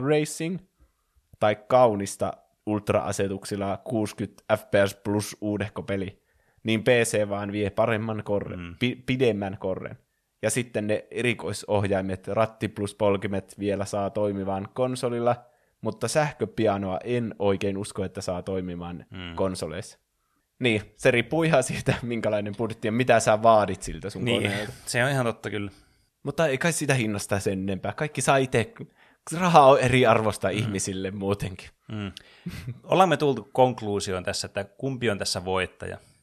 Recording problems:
abrupt cut into speech; at the start

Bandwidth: 13.5 kHz